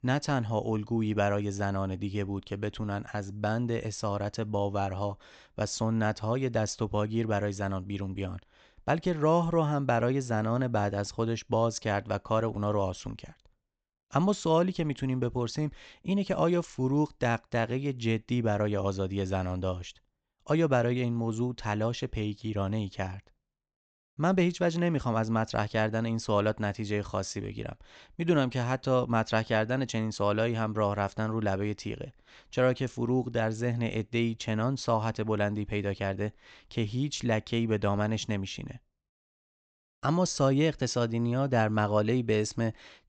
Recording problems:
high frequencies cut off; noticeable; nothing above 8 kHz

